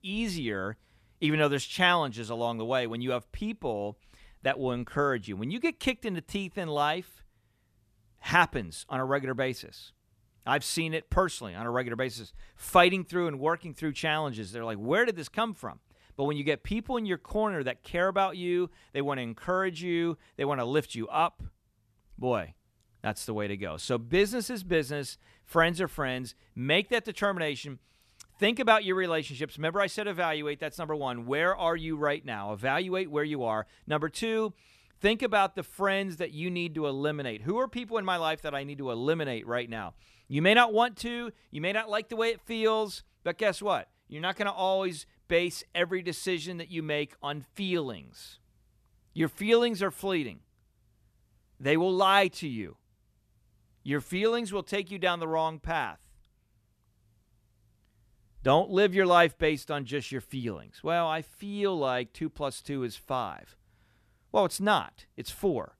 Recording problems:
none

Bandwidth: 14 kHz